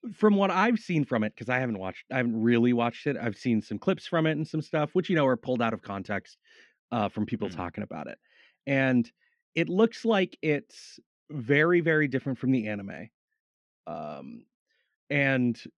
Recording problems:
muffled; slightly; fading above 3 kHz

